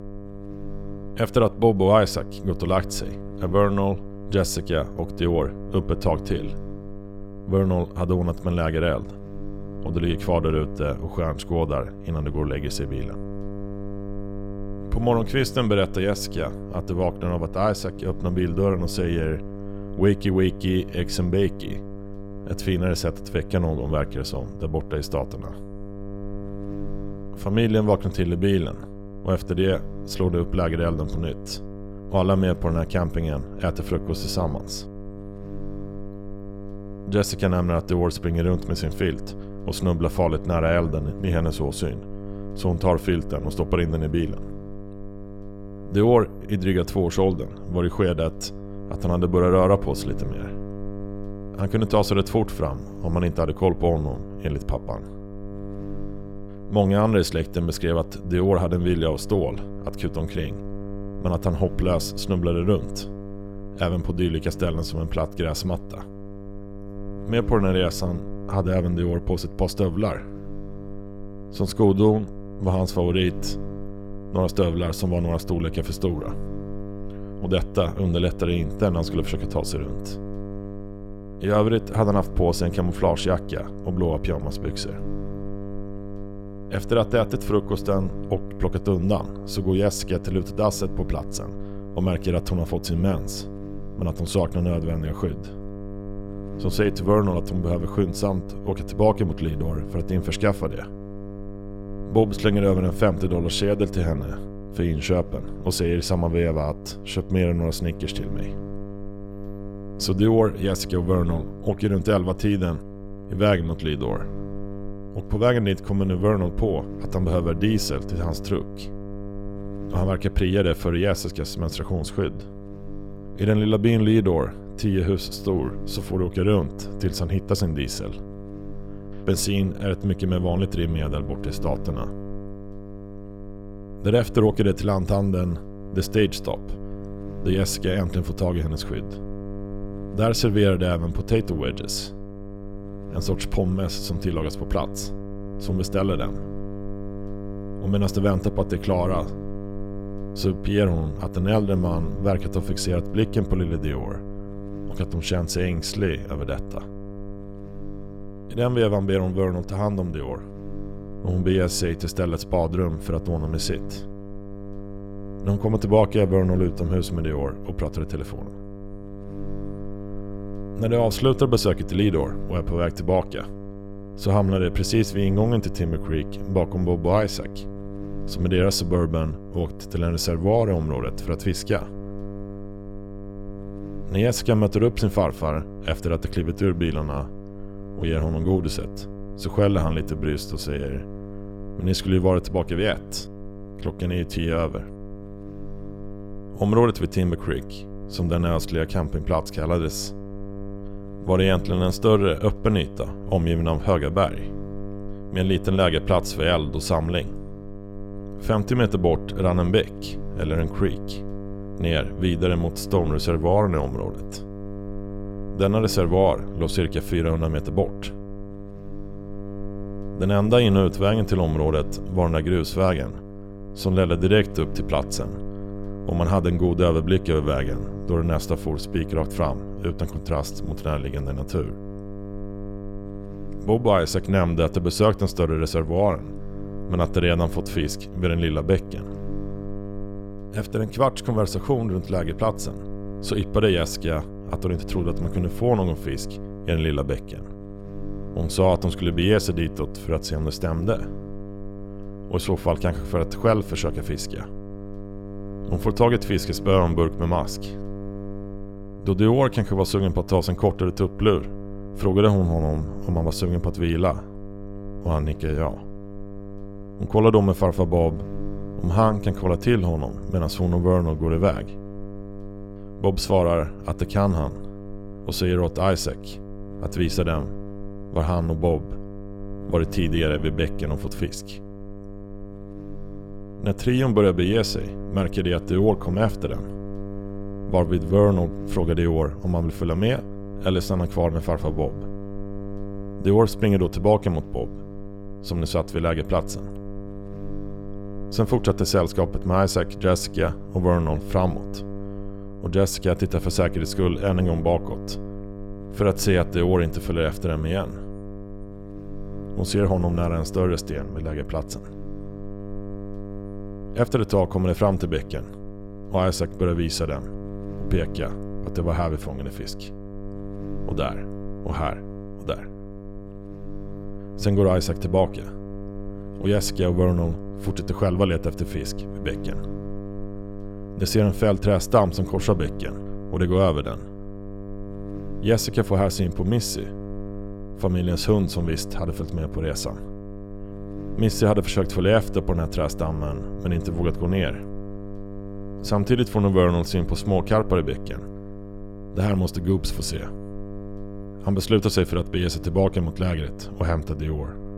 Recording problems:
electrical hum; noticeable; throughout; 50 Hz, 15 dB below the speech

